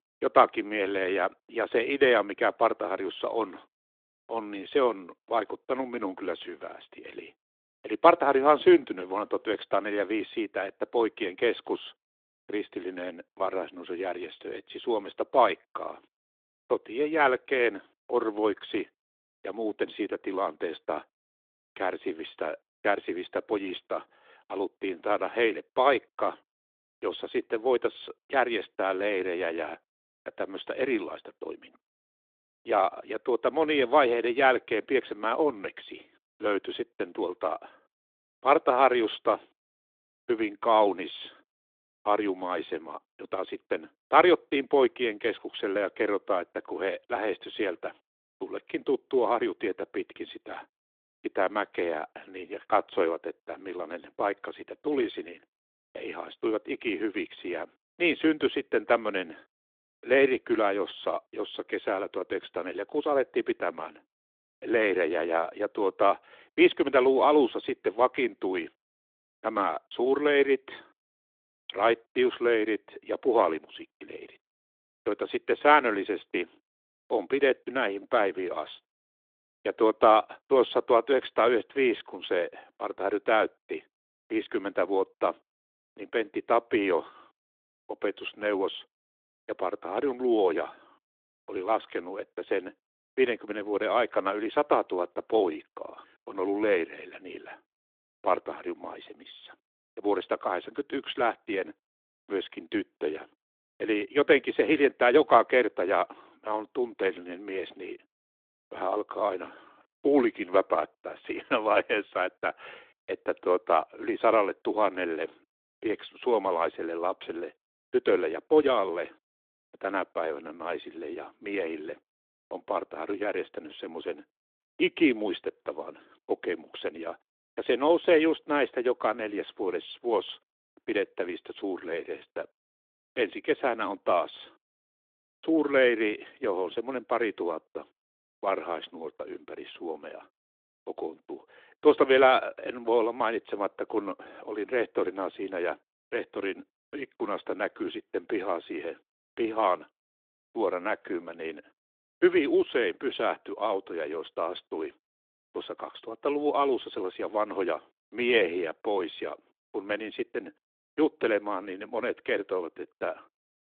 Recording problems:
phone-call audio

